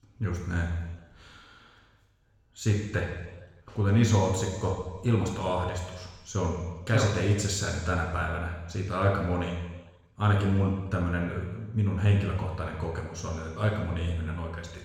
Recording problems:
room echo; noticeable; dies away in 1.1 s
off-mic speech; somewhat distant

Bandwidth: 17 kHz